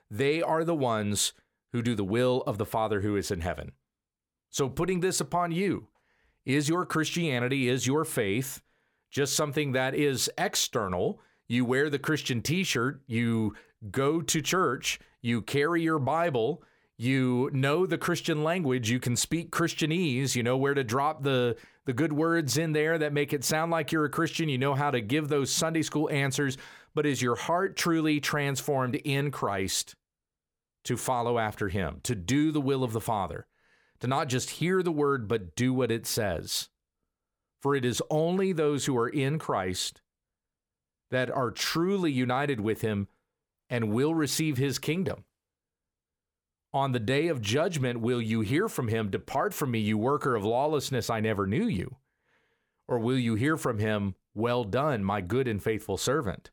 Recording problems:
none

